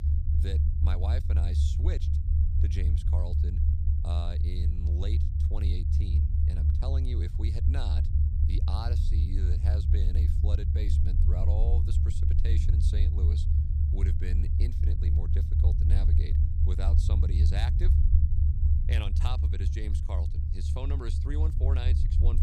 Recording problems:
low rumble; loud; throughout; as loud as the speech

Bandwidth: 14.5 kHz